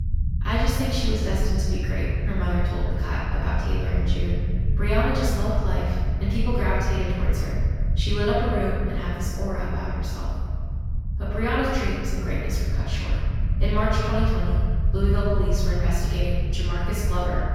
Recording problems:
room echo; strong; dies away in 1.7 s
off-mic speech; far
low rumble; noticeable; throughout; 15 dB below the speech

